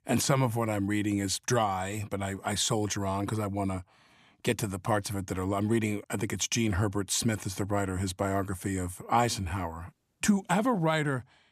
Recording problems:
none

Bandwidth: 14.5 kHz